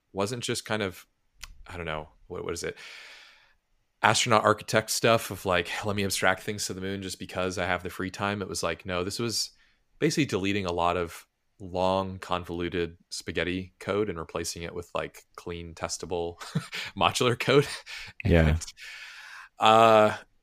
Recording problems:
none

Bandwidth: 15 kHz